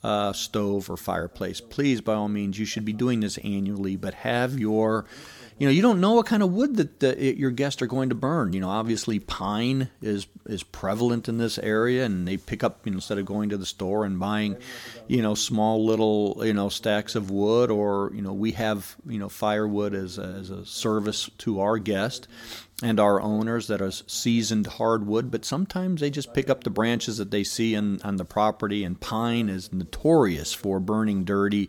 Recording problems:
voice in the background; faint; throughout; 25 dB below the speech

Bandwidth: 18 kHz